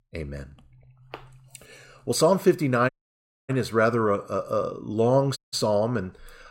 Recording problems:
audio cutting out; at 3 s for 0.5 s and at 5.5 s

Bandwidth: 16 kHz